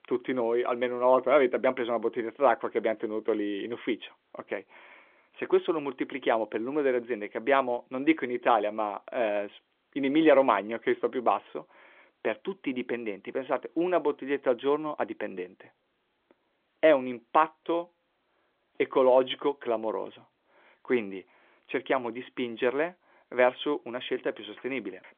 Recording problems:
phone-call audio; nothing above 3.5 kHz

